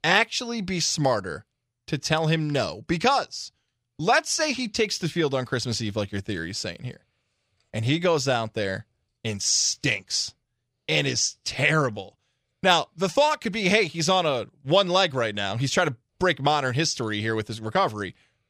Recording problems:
none

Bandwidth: 15.5 kHz